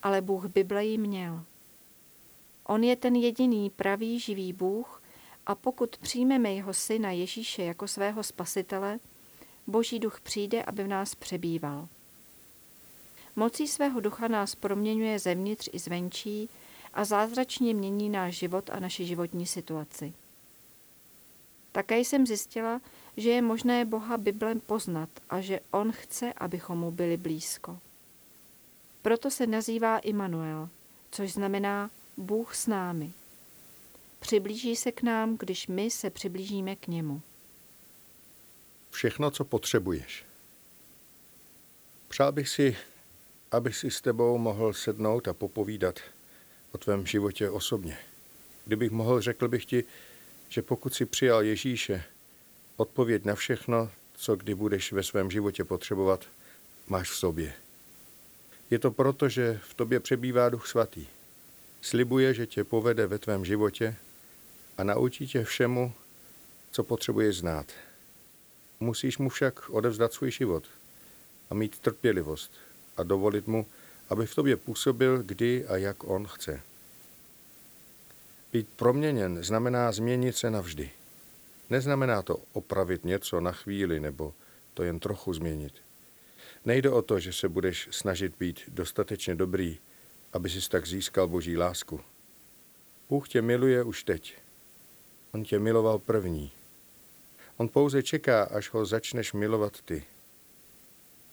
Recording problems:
hiss; faint; throughout; 20 dB below the speech

